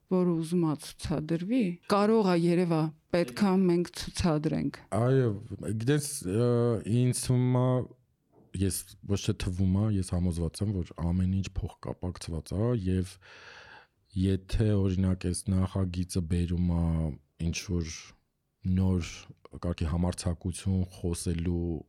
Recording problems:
uneven, jittery; strongly; from 1 to 21 s

